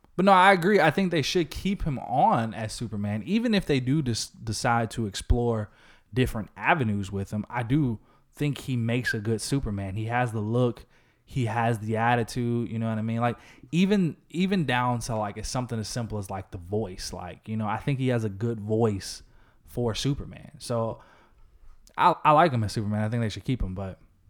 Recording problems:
none

